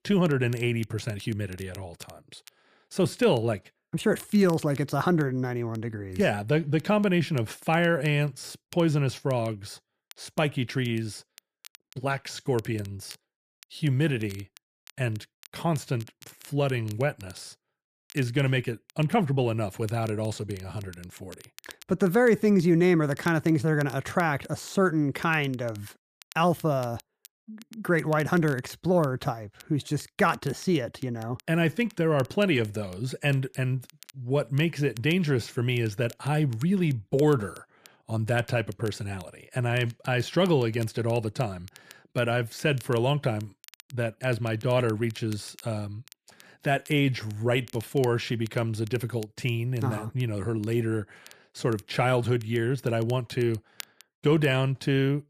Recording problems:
crackle, like an old record; faint; 25 dB below the speech

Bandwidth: 14.5 kHz